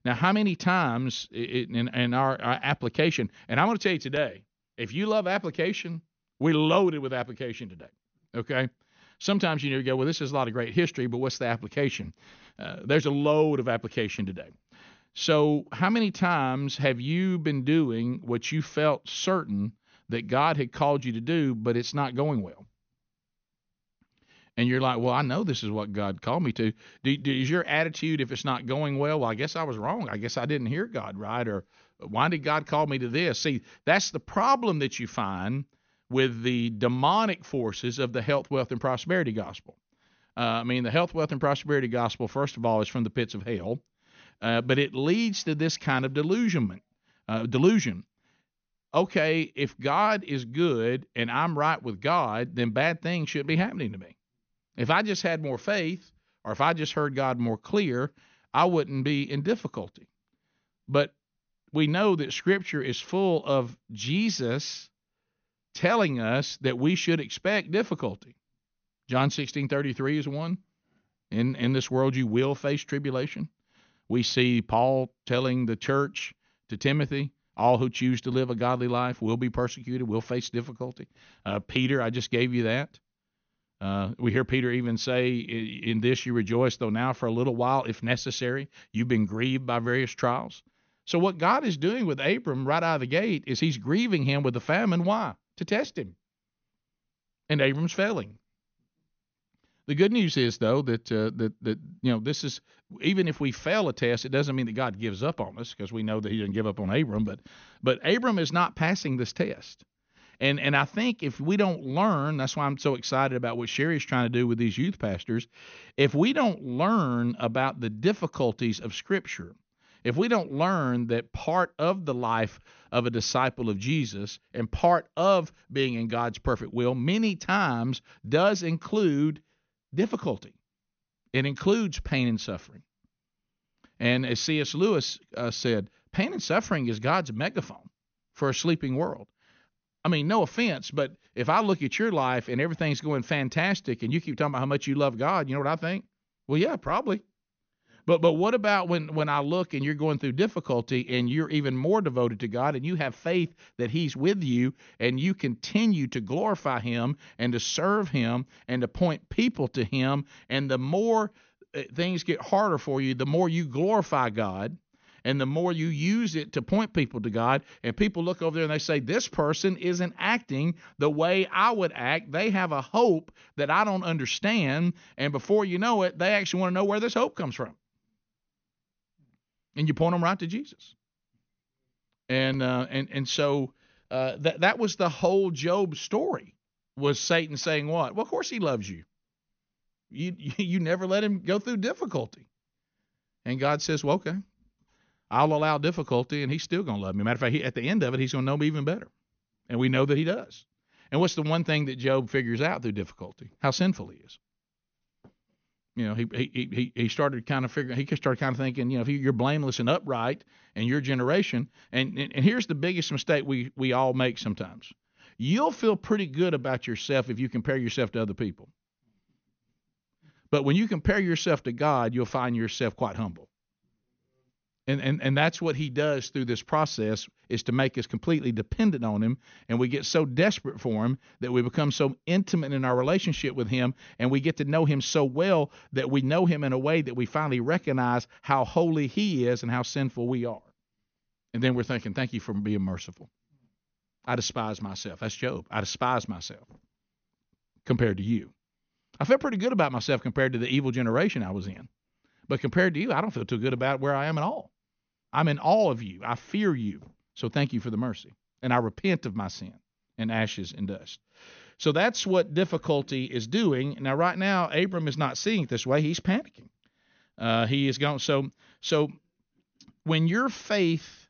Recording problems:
high frequencies cut off; noticeable; nothing above 6.5 kHz

